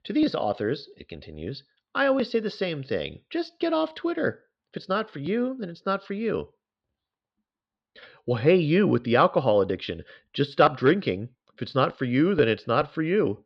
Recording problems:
muffled; slightly; fading above 4 kHz

